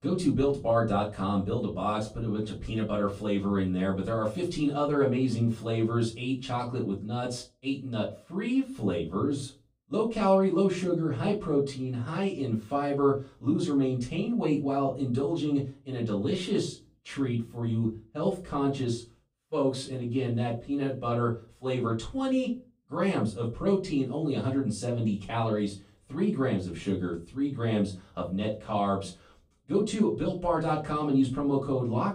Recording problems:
off-mic speech; far
room echo; slight; dies away in 0.3 s

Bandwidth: 15.5 kHz